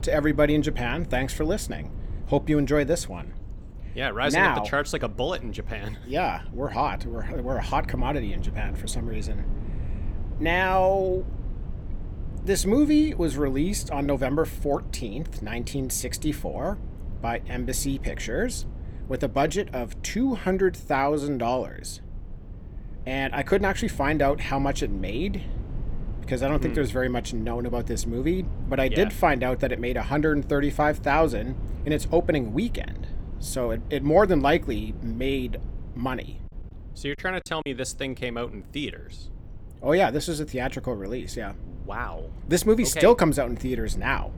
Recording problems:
low rumble; faint; throughout; 25 dB below the speech
choppy; very; at 37 s; 8% of the speech affected

